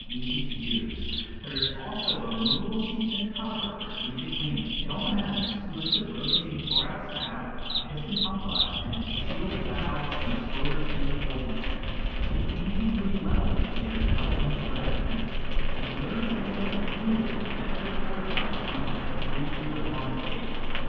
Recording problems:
room echo; strong; dies away in 2.1 s
off-mic speech; far
muffled; very; fading above 3 kHz
animal sounds; very loud; throughout; 2 dB above the speech
wind in the background; loud; throughout; 2 dB below the speech
uneven, jittery; strongly; from 1 to 18 s

